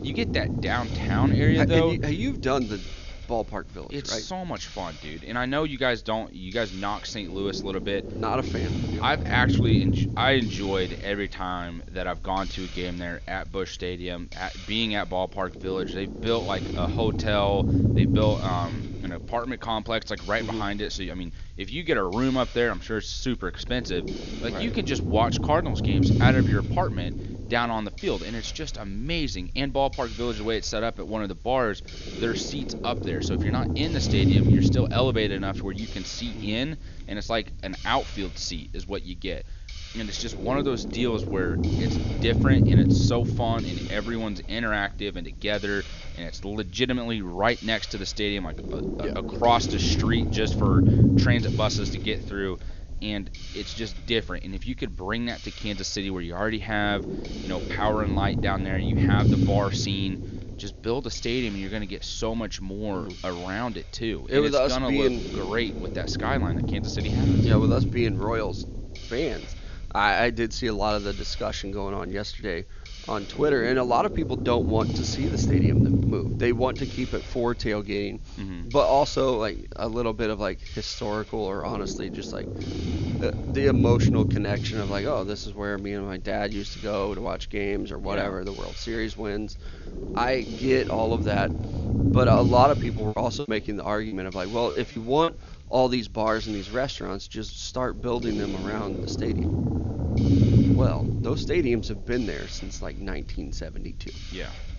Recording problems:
high frequencies cut off; noticeable; nothing above 7 kHz
low rumble; loud; throughout; 6 dB below the speech
hiss; noticeable; throughout; 15 dB below the speech
choppy; very; from 1:33 to 1:35; 11% of the speech affected

